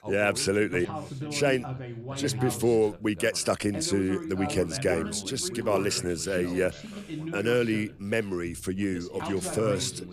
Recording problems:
background chatter; loud; throughout; 2 voices, 9 dB below the speech

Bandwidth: 14.5 kHz